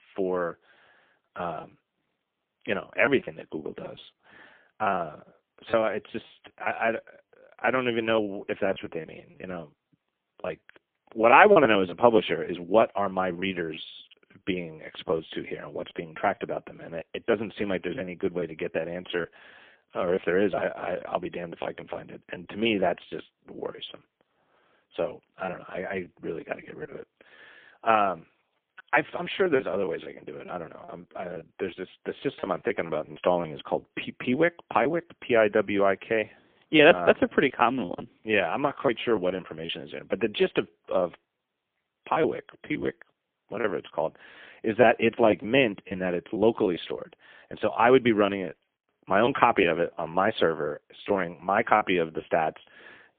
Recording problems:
phone-call audio; poor line; nothing above 3.5 kHz
choppy; very; 9% of the speech affected

